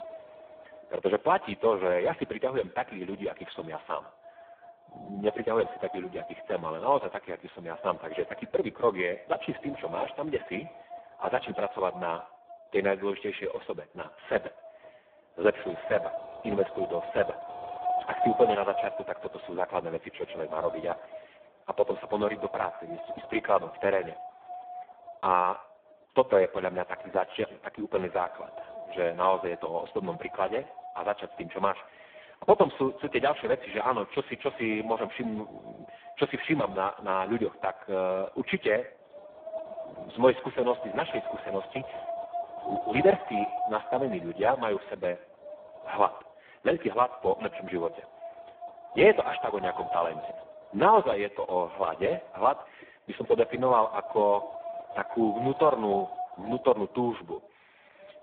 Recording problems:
phone-call audio; poor line
echo of what is said; faint; throughout; 120 ms later, 25 dB below the speech
wind noise on the microphone; occasional gusts; 10 dB below the speech

